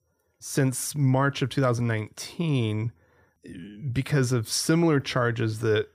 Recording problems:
none

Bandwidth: 15 kHz